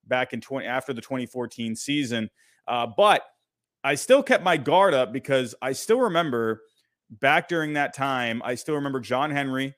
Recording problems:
none

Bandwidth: 15 kHz